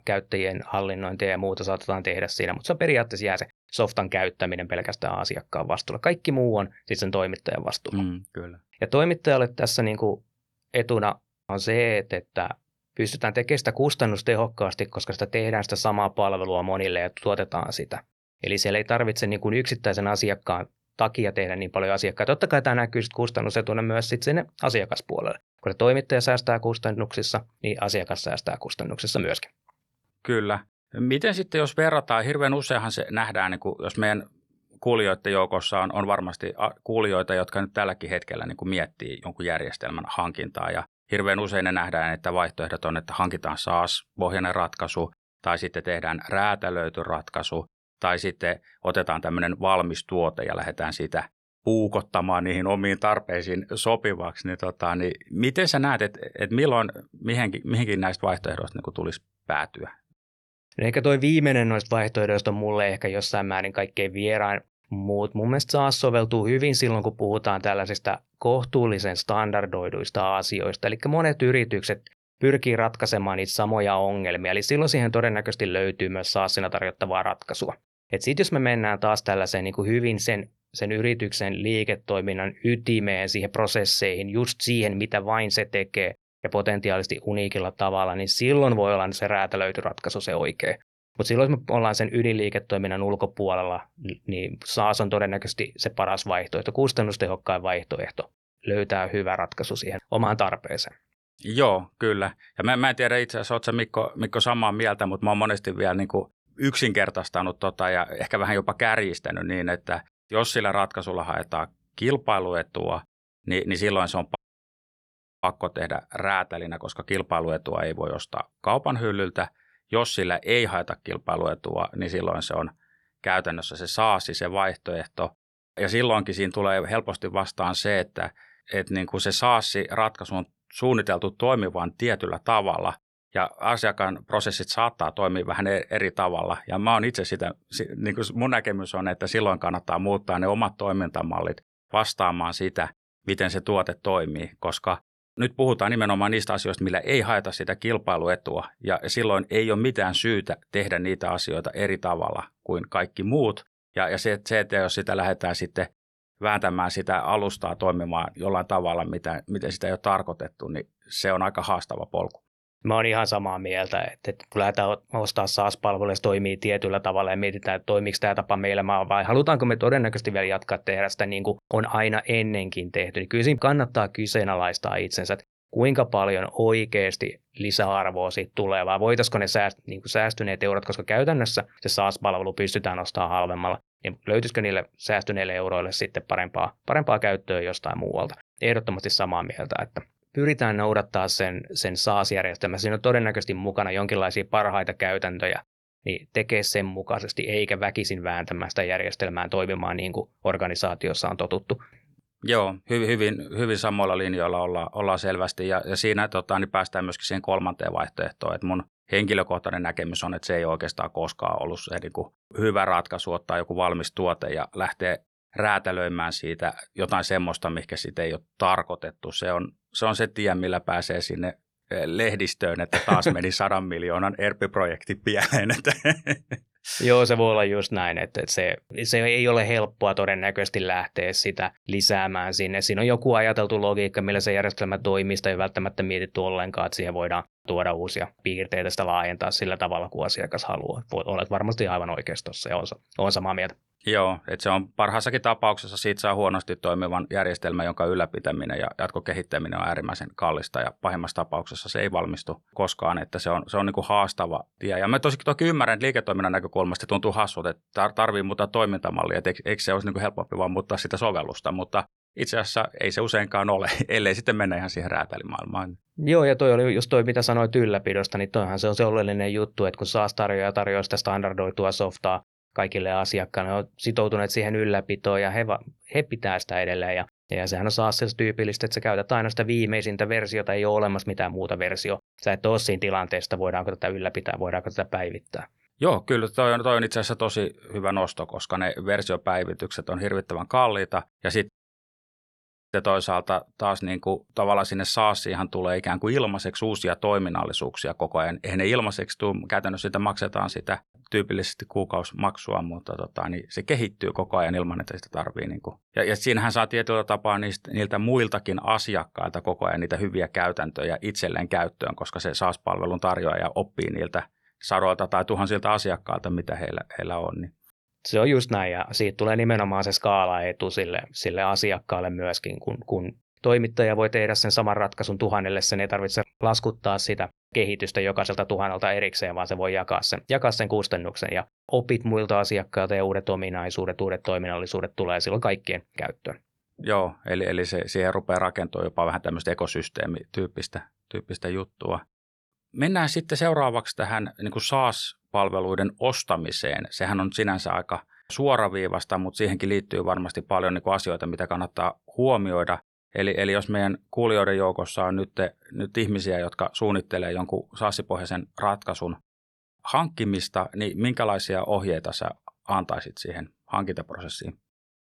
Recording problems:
audio cutting out; at 1:54 for 1 s and at 4:52 for 1 s

